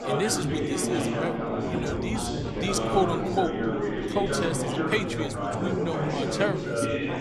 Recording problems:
chatter from many people; very loud; throughout; 2 dB above the speech

